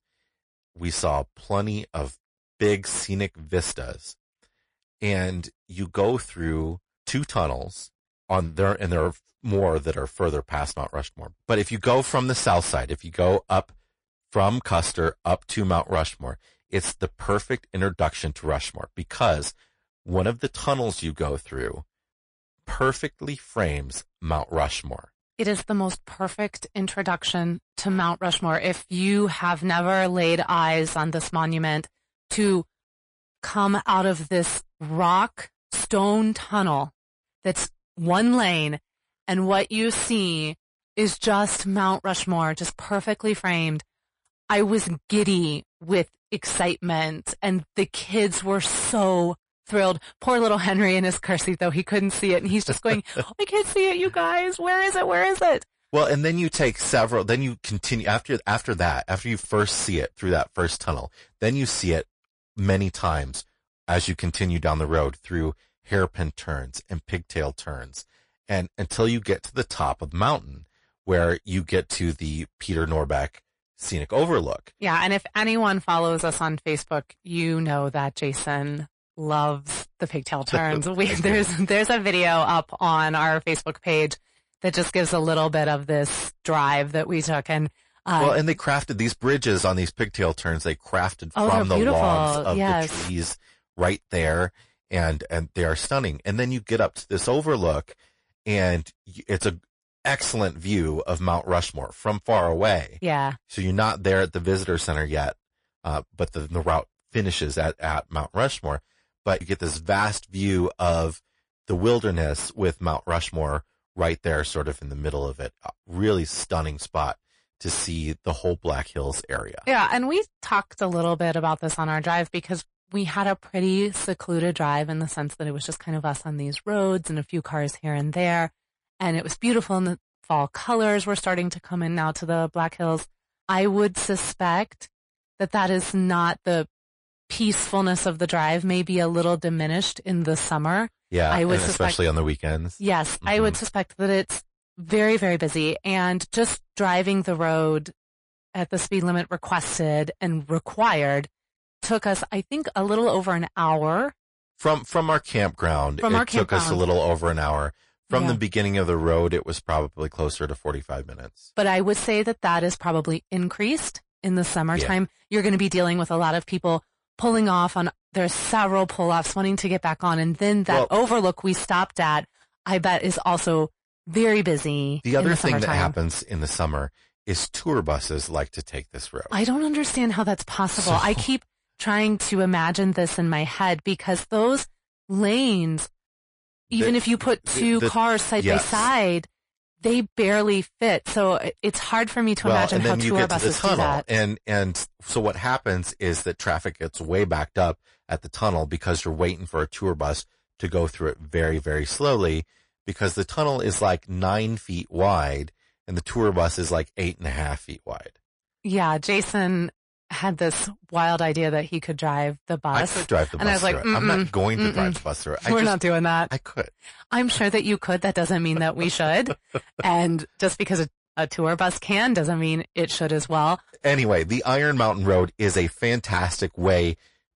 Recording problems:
distortion; slight; 10 dB below the speech
garbled, watery; slightly; nothing above 10.5 kHz

